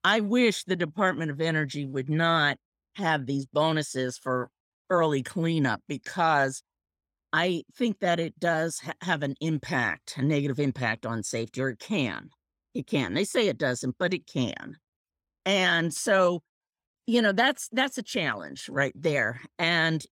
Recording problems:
none

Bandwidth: 16.5 kHz